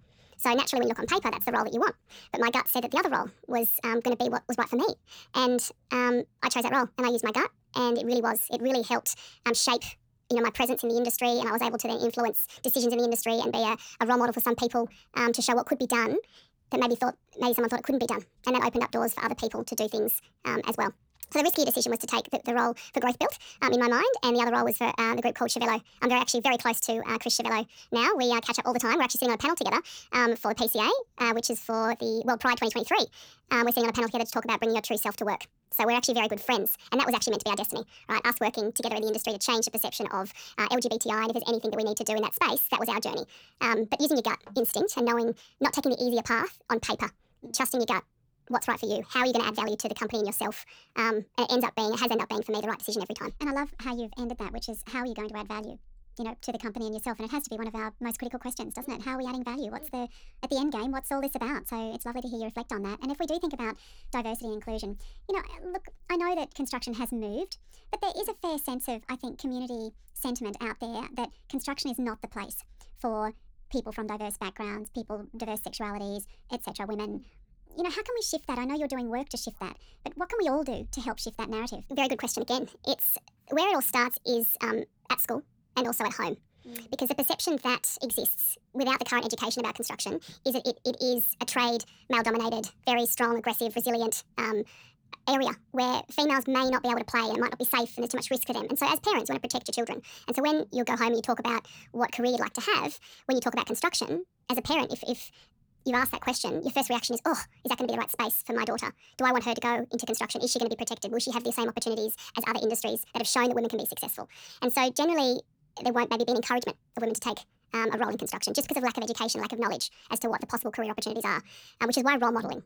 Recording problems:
wrong speed and pitch; too fast and too high; 1.5 times normal speed

